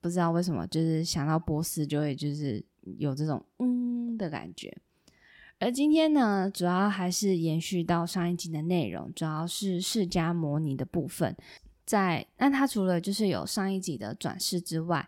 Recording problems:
none

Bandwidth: 16.5 kHz